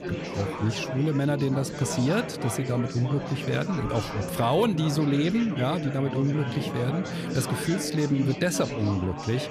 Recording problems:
chatter from many people; loud; throughout; 6 dB below the speech

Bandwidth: 14.5 kHz